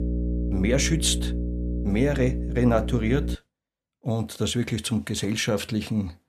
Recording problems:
electrical hum; noticeable; until 3.5 s; 60 Hz, 10 dB below the speech

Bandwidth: 14.5 kHz